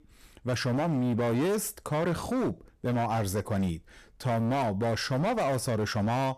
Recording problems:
distortion; slight; 21% of the sound clipped

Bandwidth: 14.5 kHz